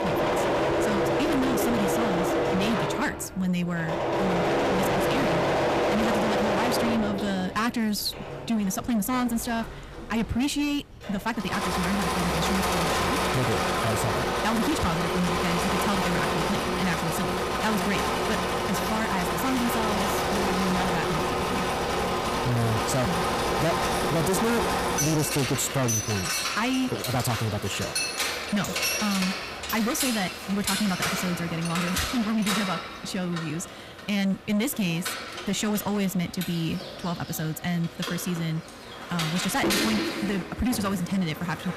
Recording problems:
distortion; heavy; 22% of the sound clipped
wrong speed, natural pitch; too fast; 1.5 times normal speed
machinery noise; very loud; throughout; 2 dB above the speech

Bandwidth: 14.5 kHz